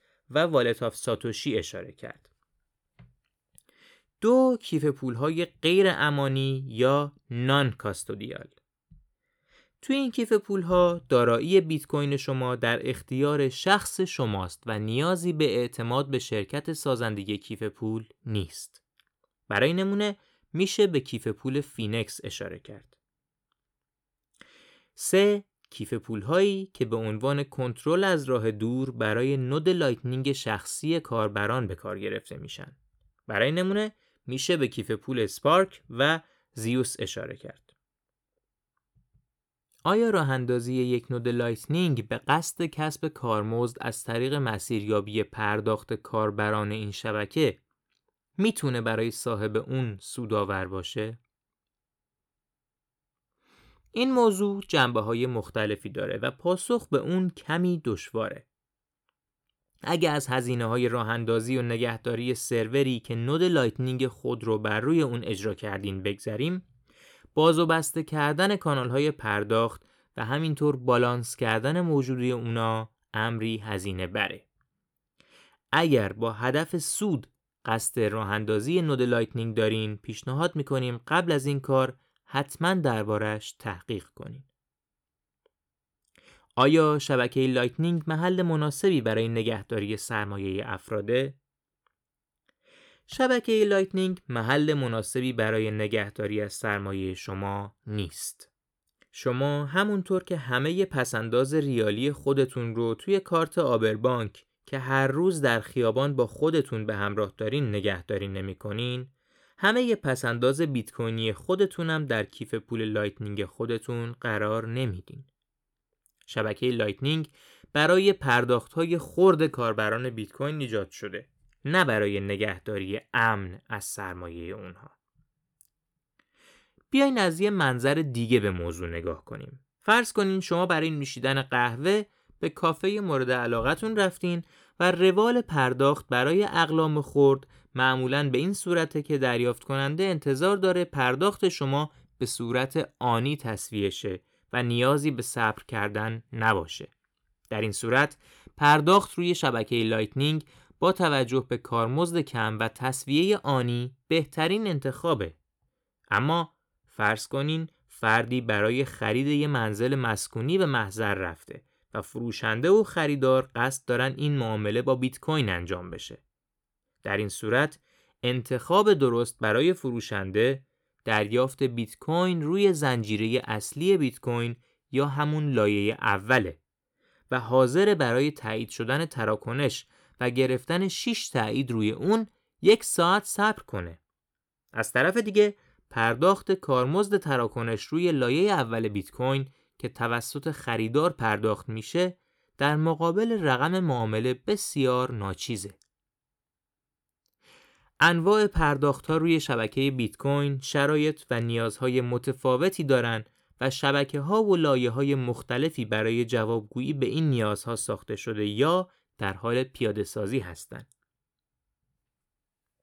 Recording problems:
none

